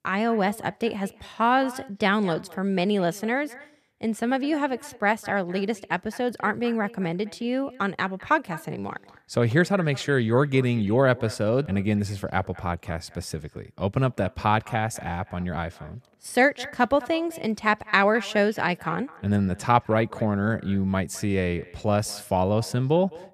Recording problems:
echo of what is said; faint; throughout; 210 ms later, 20 dB below the speech

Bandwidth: 14.5 kHz